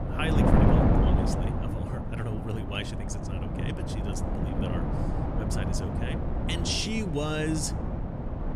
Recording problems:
wind noise on the microphone; heavy; 1 dB above the speech

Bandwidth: 14.5 kHz